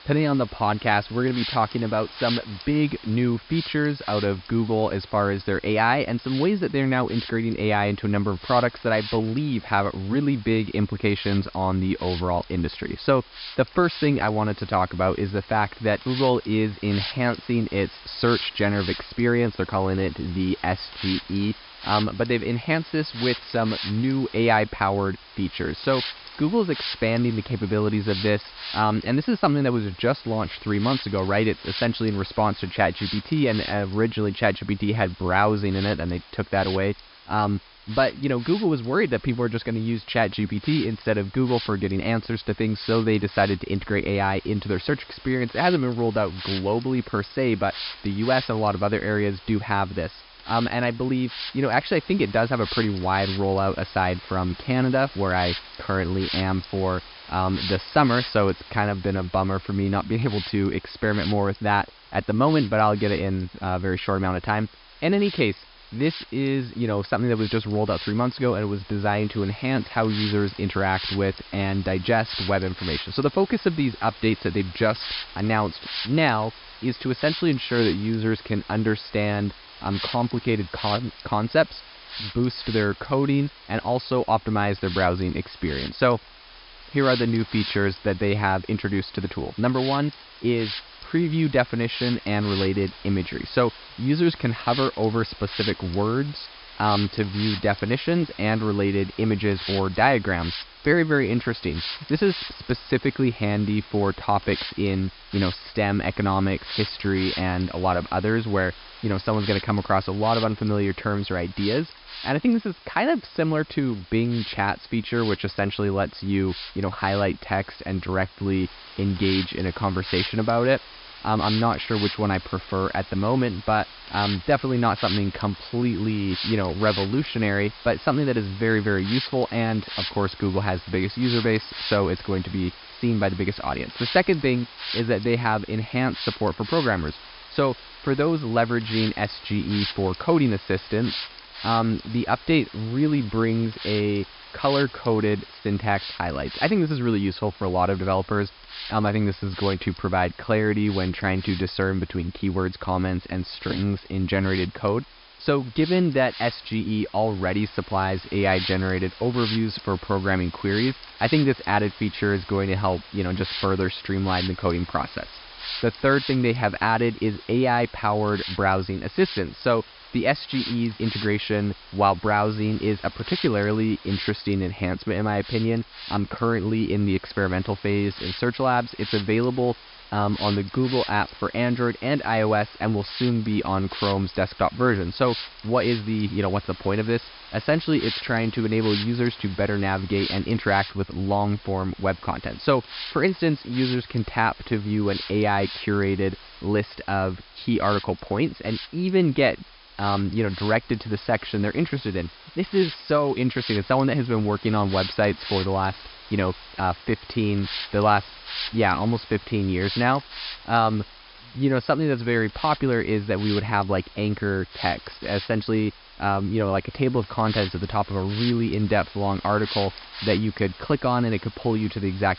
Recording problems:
high frequencies cut off; noticeable; nothing above 5.5 kHz
hiss; noticeable; throughout; 10 dB below the speech

